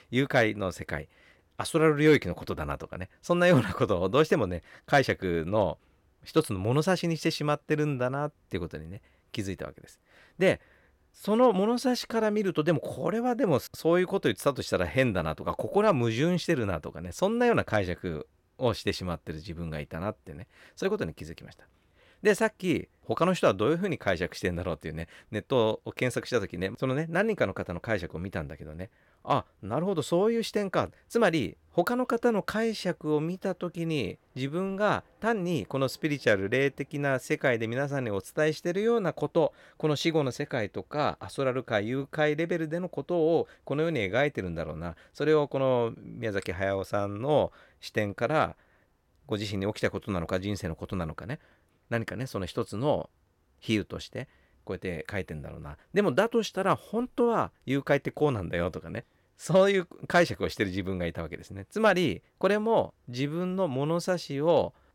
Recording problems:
none

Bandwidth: 16.5 kHz